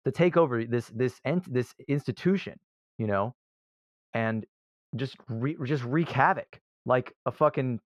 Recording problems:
muffled; very; fading above 3 kHz

